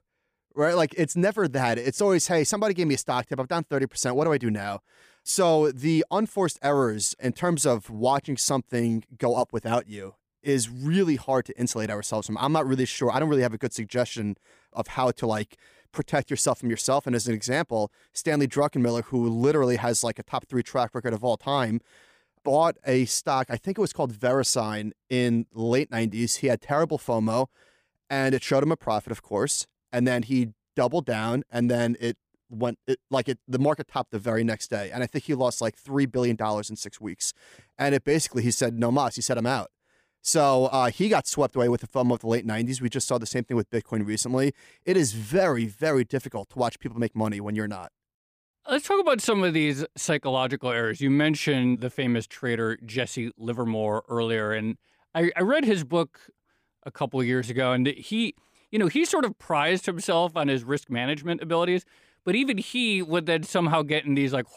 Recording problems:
none

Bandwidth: 15 kHz